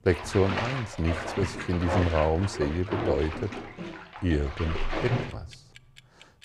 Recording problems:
household noises; loud; throughout; 5 dB below the speech

